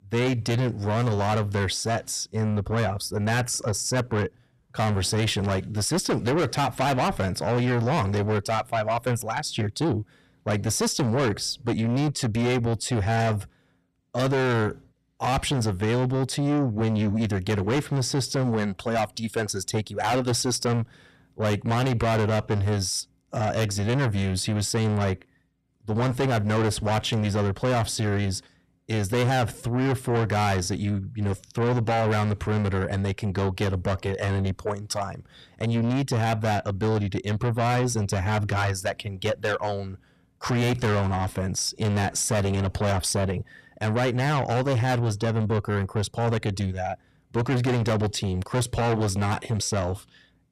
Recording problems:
distortion; heavy; 7 dB below the speech

